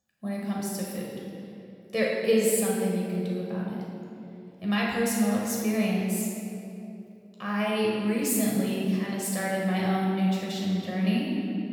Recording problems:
room echo; strong; dies away in 2.2 s
off-mic speech; far

